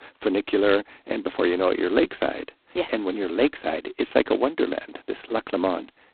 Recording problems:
phone-call audio; poor line; nothing above 4 kHz

